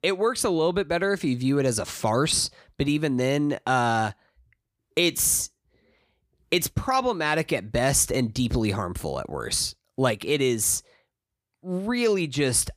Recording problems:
none

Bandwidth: 15 kHz